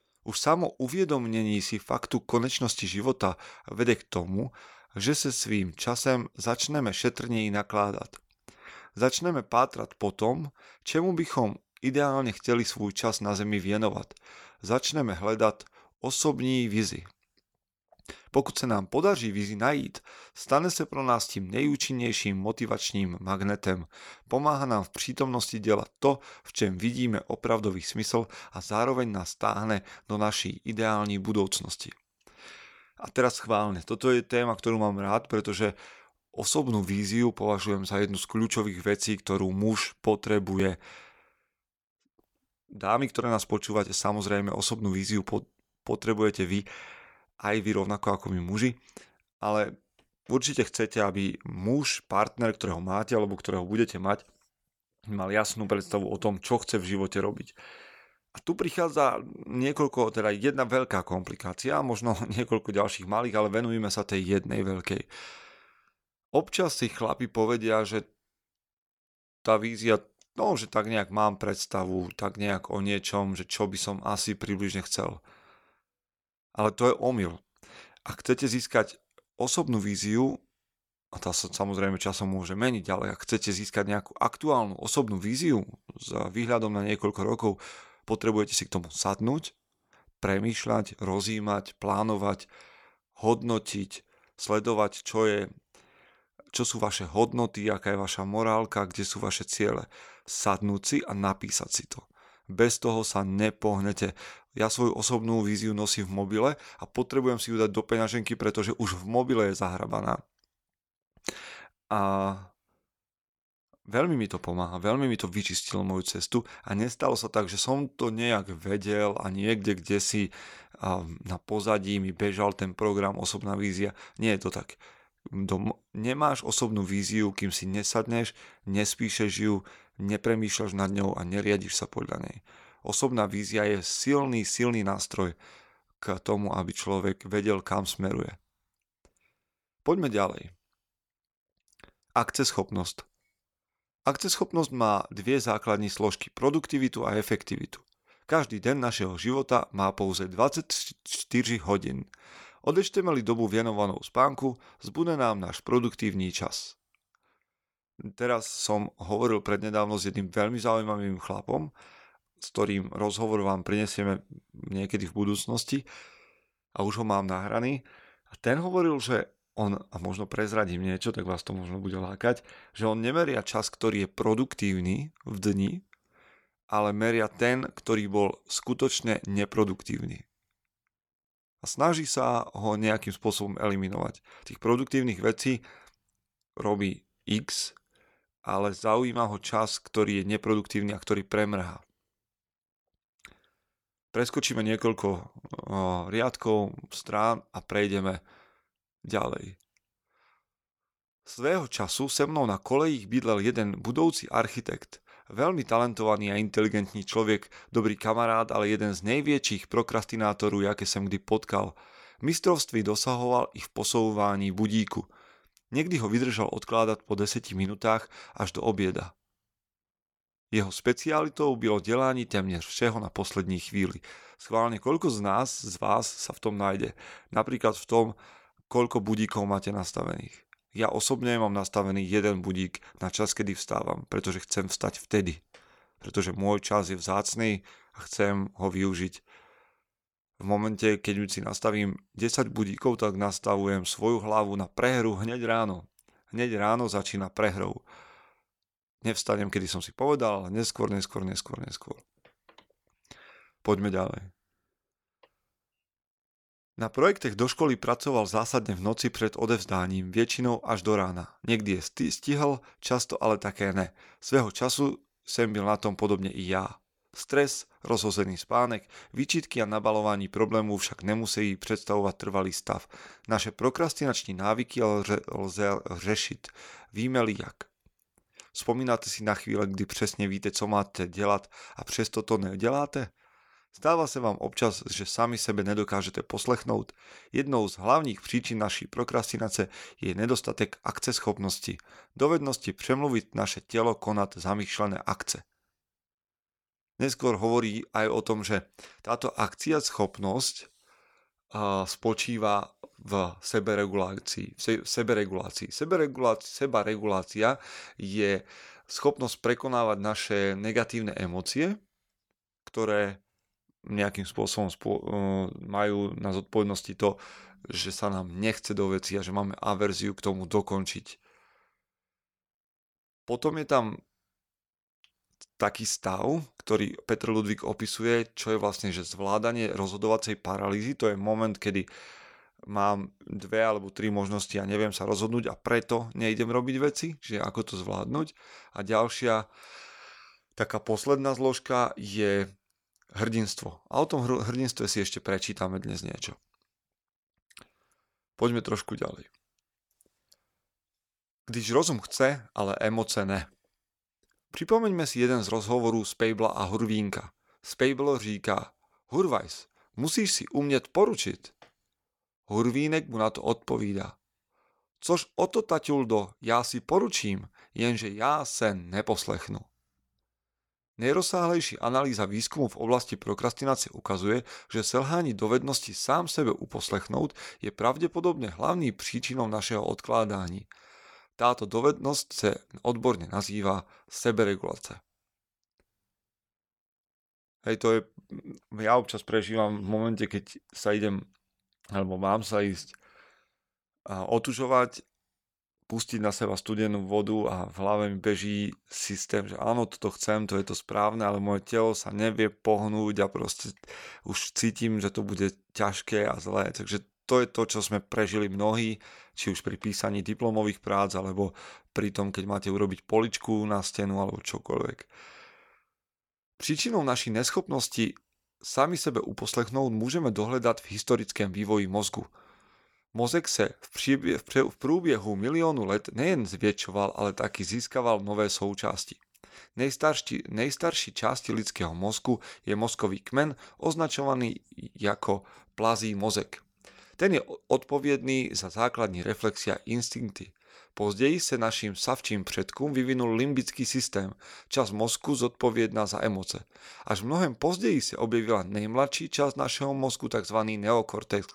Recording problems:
none

